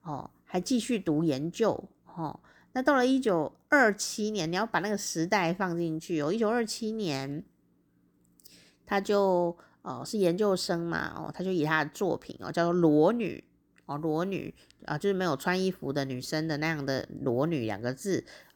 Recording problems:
none

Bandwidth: 18.5 kHz